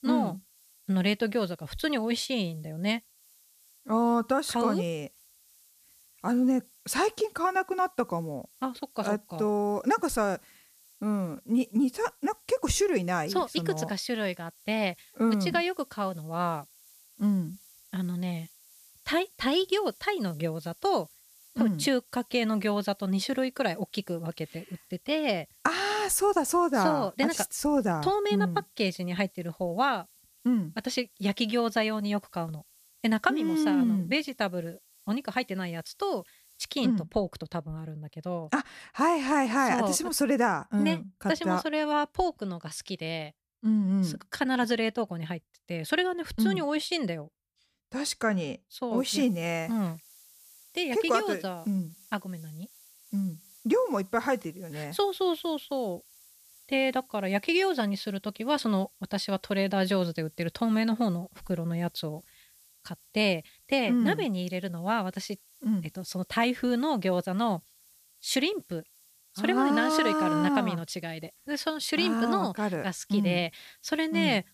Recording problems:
hiss; faint; until 37 s and from 49 s on; 25 dB below the speech

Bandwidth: 14.5 kHz